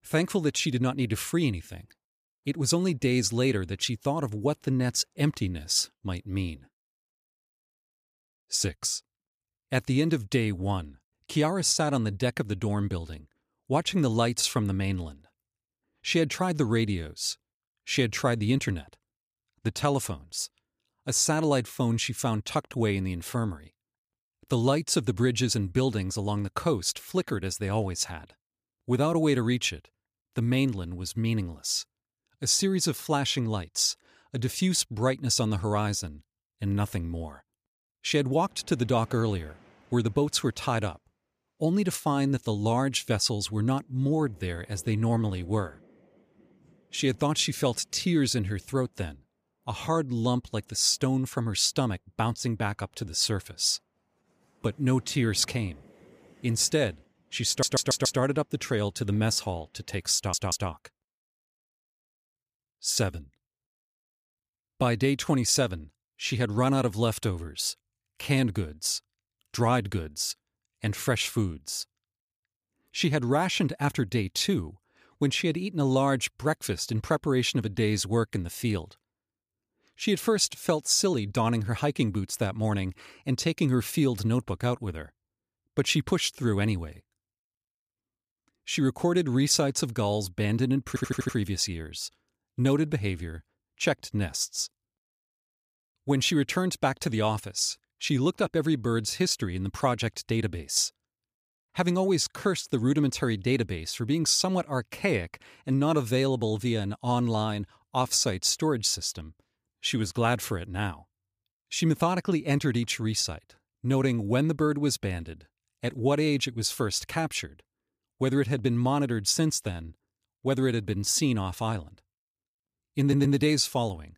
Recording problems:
audio stuttering; 4 times, first at 57 s

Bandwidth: 15 kHz